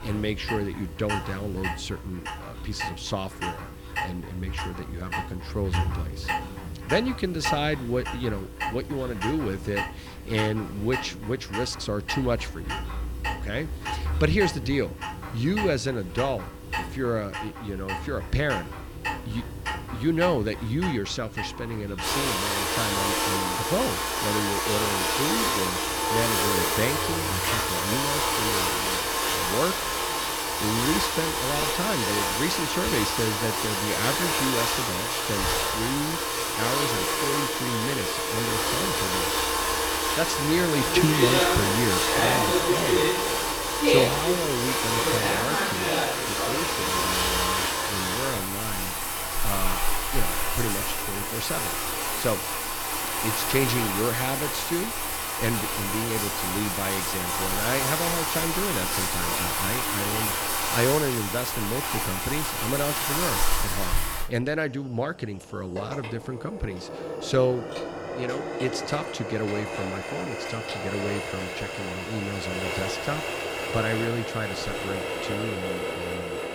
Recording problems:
household noises; very loud; throughout; 4 dB above the speech

